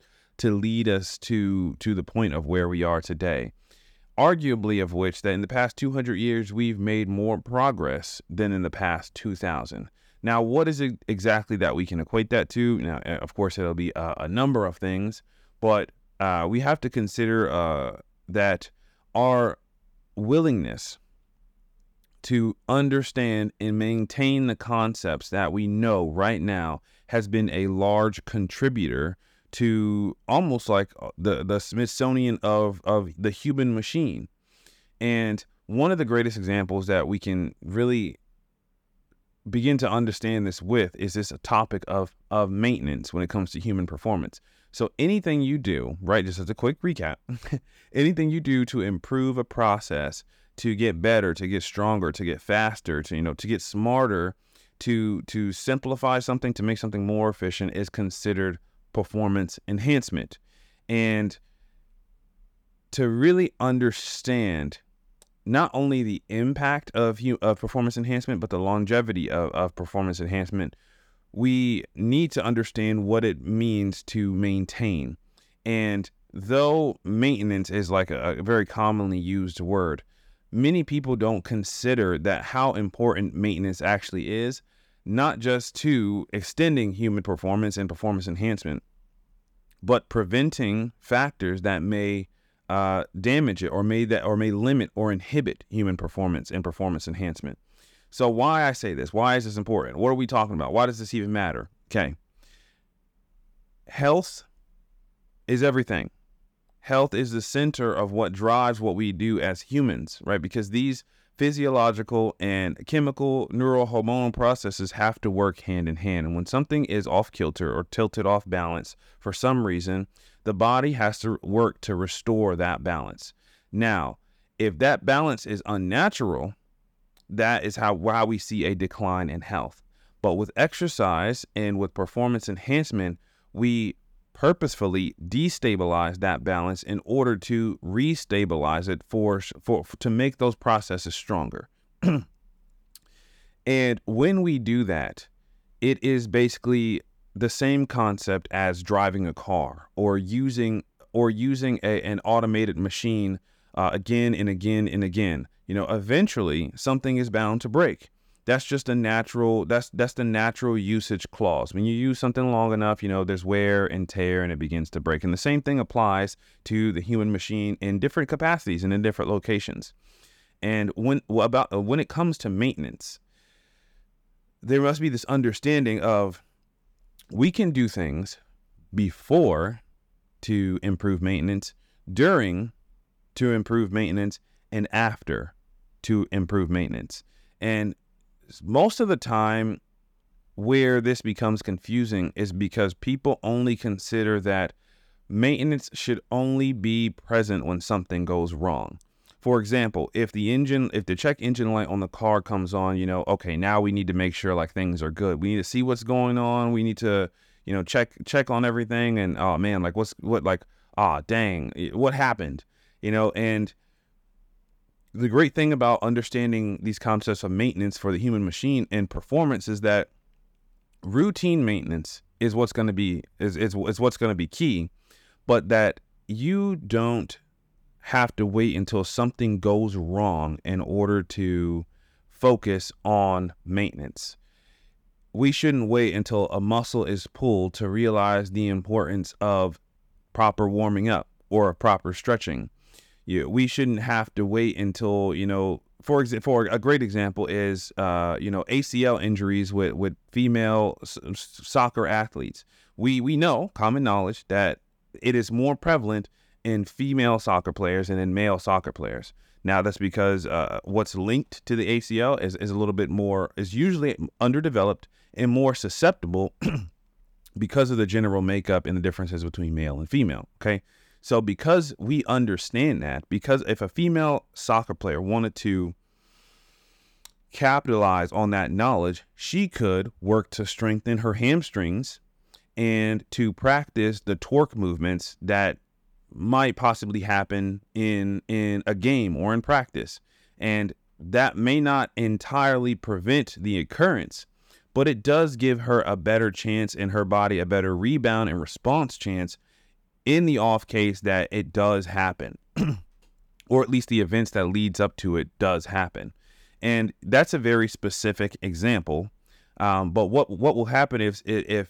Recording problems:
none

